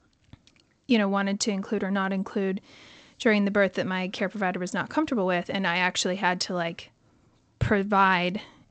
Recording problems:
garbled, watery; slightly; nothing above 8 kHz

